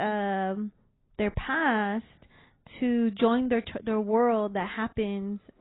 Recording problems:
garbled, watery; badly; nothing above 4 kHz
abrupt cut into speech; at the start

